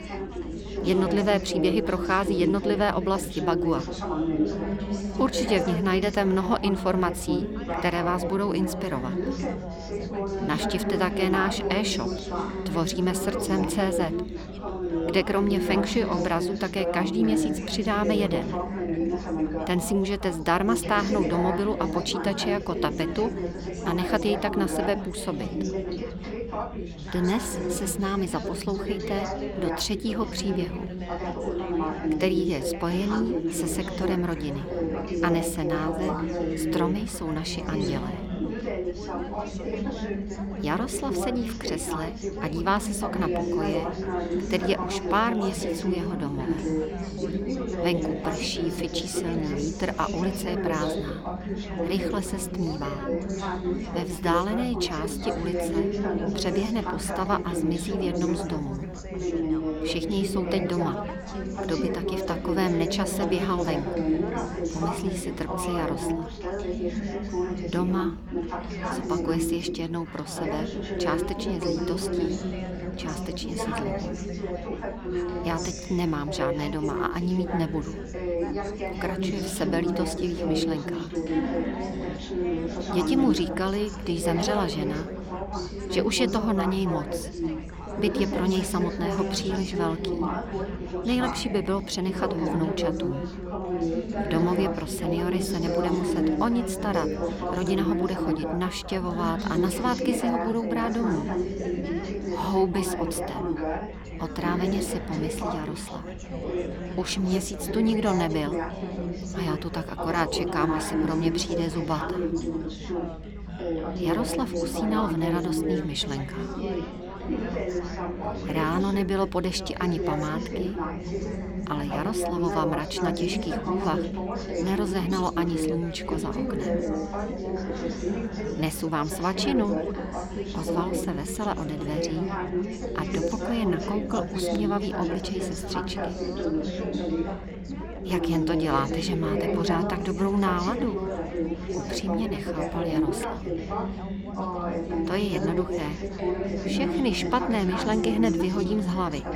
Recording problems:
chatter from many people; loud; throughout; 1 dB below the speech

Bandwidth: 18.5 kHz